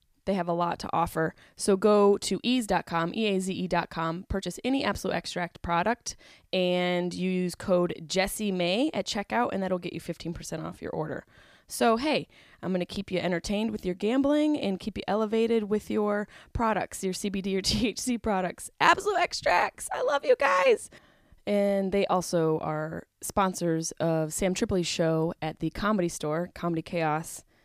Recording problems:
none

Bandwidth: 15 kHz